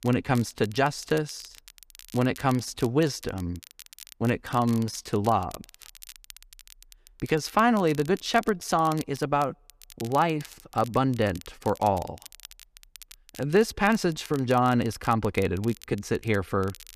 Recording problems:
crackle, like an old record; faint; 20 dB below the speech

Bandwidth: 14.5 kHz